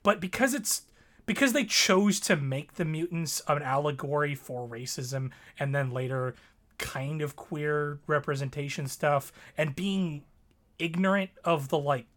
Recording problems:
none

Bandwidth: 17.5 kHz